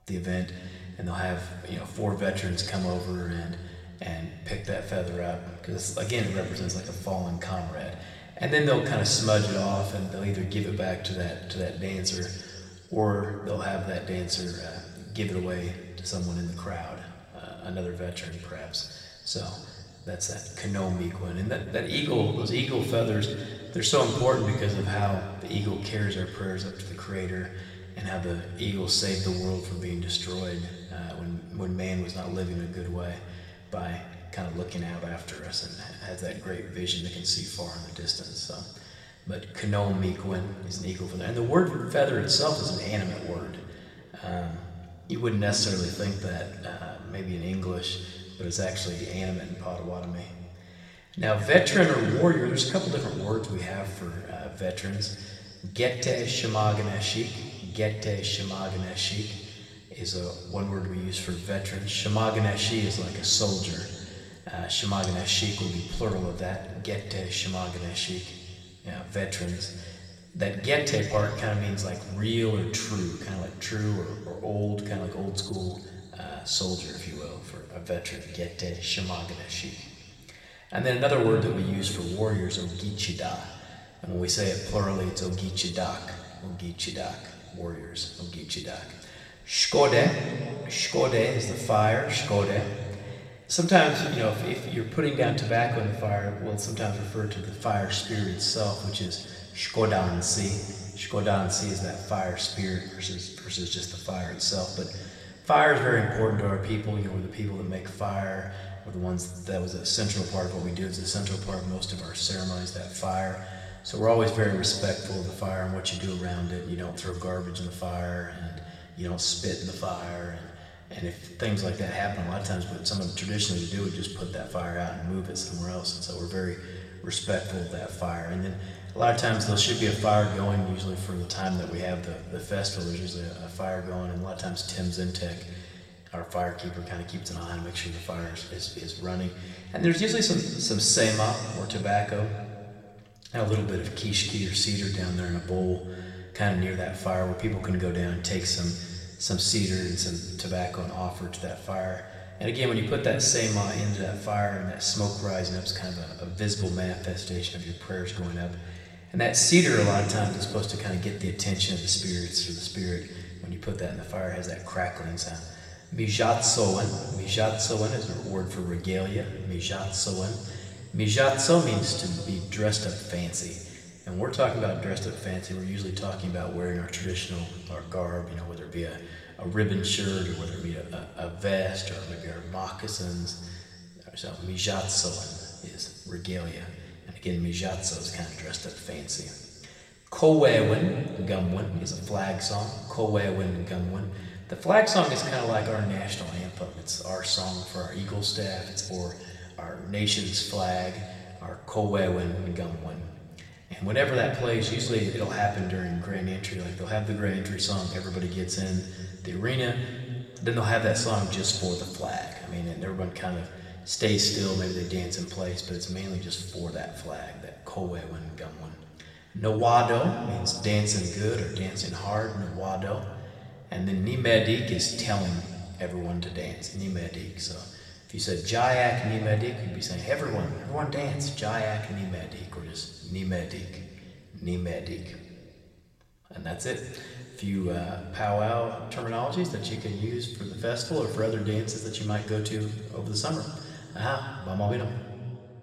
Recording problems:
room echo; noticeable; dies away in 2.1 s
off-mic speech; somewhat distant

